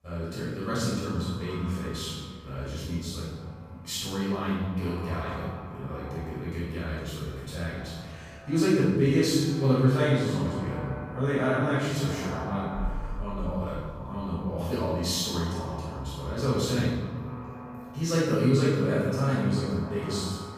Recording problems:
room echo; strong; dies away in 1.4 s
off-mic speech; far
echo of what is said; noticeable; throughout; 230 ms later, 15 dB below the speech

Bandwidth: 15 kHz